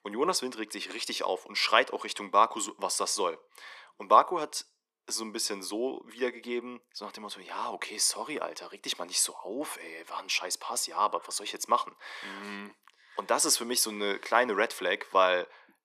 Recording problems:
thin; very; fading below 250 Hz

